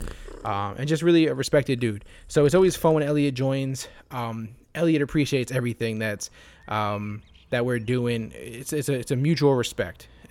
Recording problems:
animal sounds; faint; throughout; 25 dB below the speech

